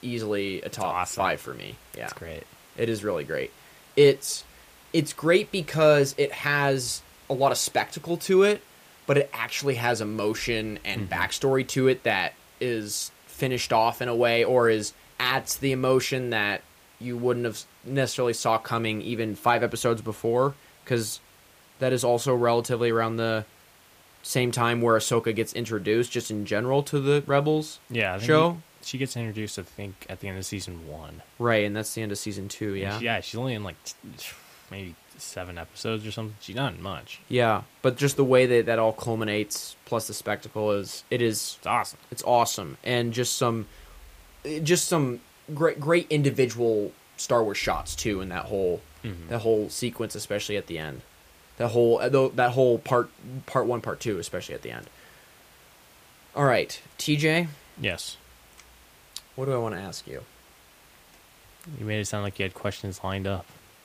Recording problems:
hiss; faint; throughout; 25 dB below the speech

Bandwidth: 15 kHz